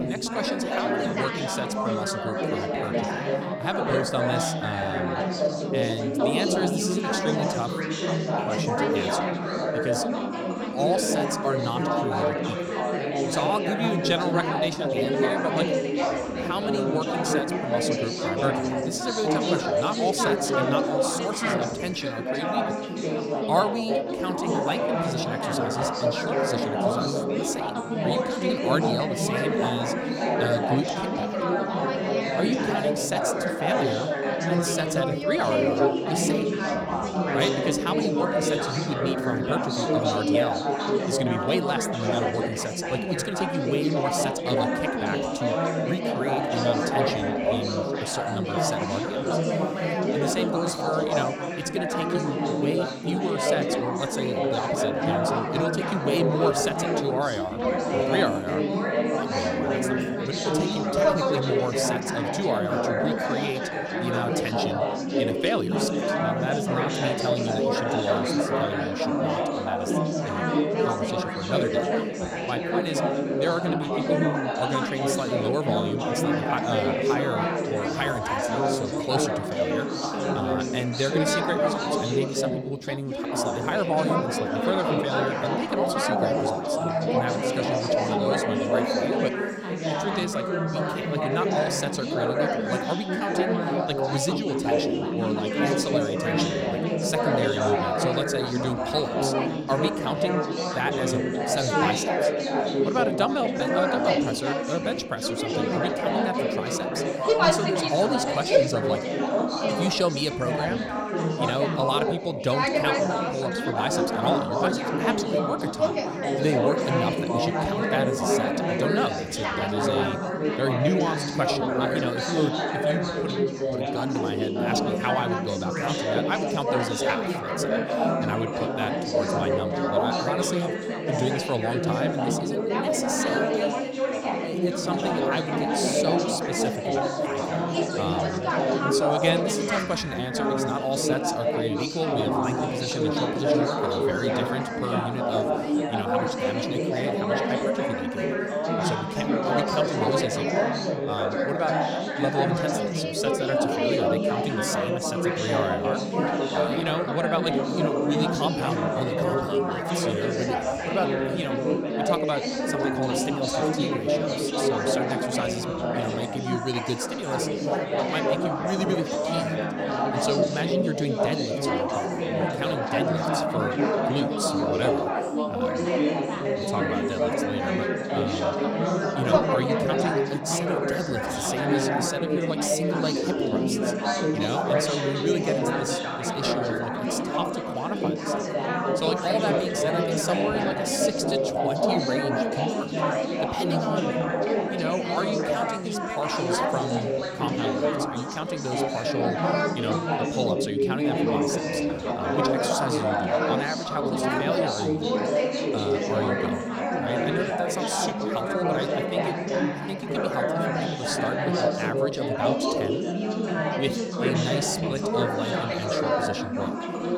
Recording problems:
chatter from many people; very loud; throughout; 5 dB above the speech

